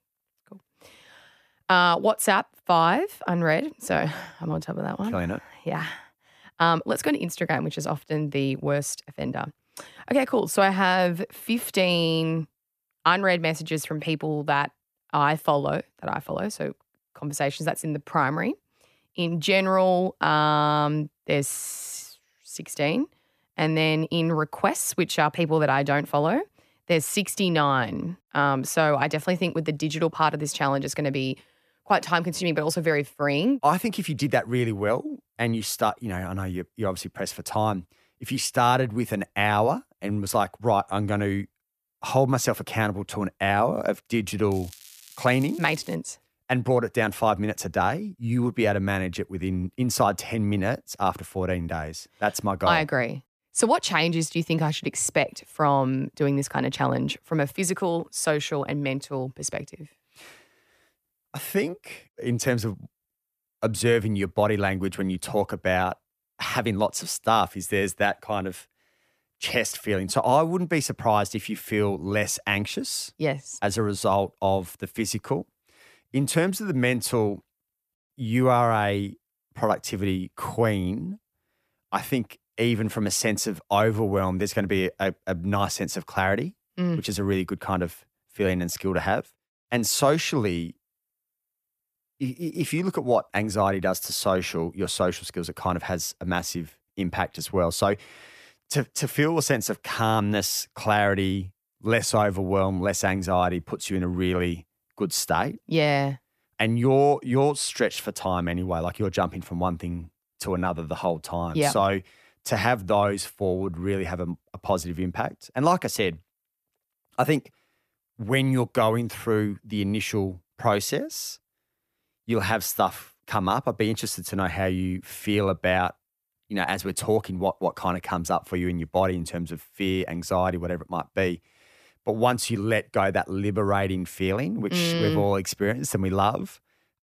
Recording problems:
crackling; faint; from 45 to 46 s; 20 dB below the speech

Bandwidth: 14.5 kHz